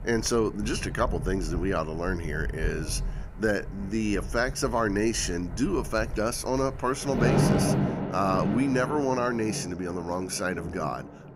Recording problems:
rain or running water; loud; throughout; 4 dB below the speech

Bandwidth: 15.5 kHz